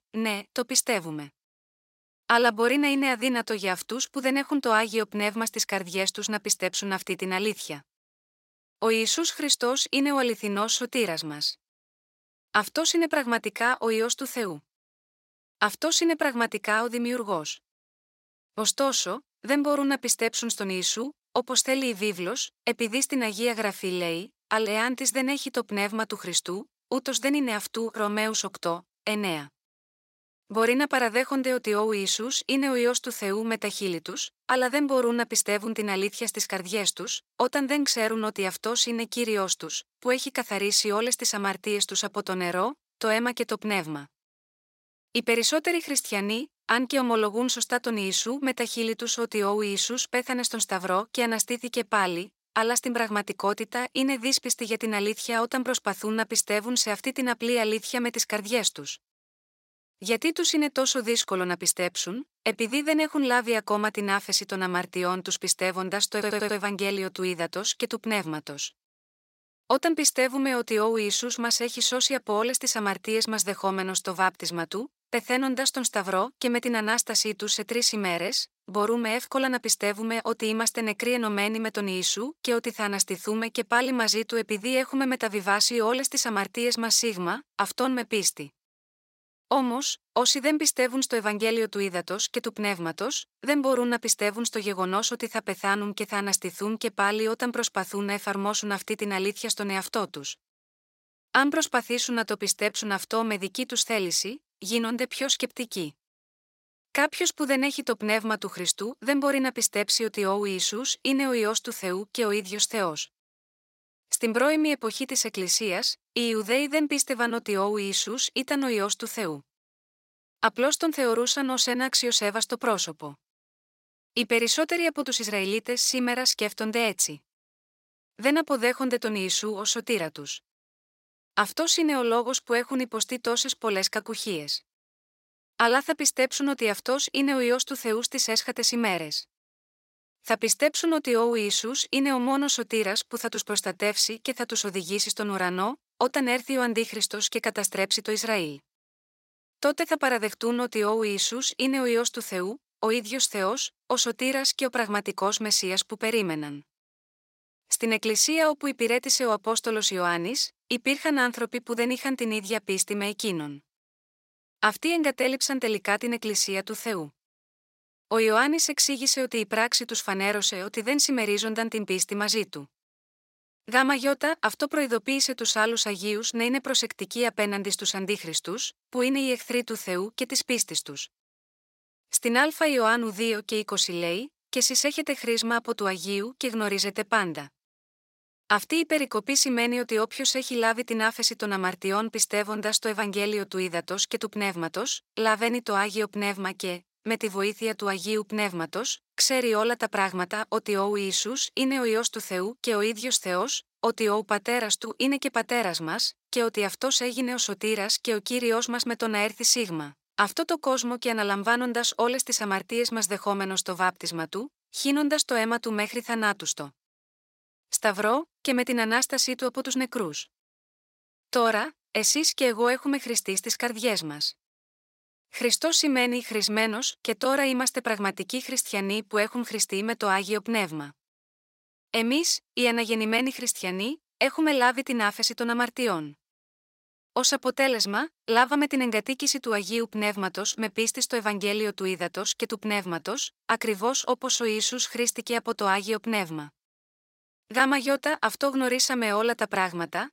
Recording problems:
thin; very slightly; fading below 1 kHz
audio stuttering; at 1:06

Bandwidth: 16 kHz